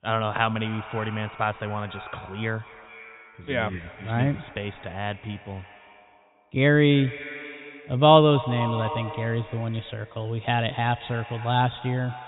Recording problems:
high frequencies cut off; severe; nothing above 4 kHz
echo of what is said; noticeable; throughout; 230 ms later, 15 dB below the speech

